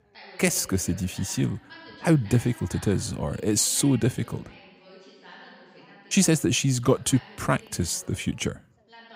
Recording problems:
background chatter; faint; throughout; 2 voices, 20 dB below the speech

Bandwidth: 15.5 kHz